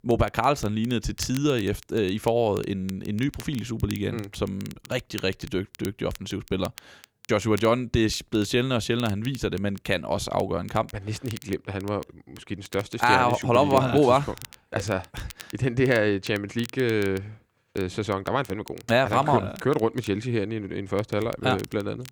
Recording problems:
crackle, like an old record; faint; 20 dB below the speech

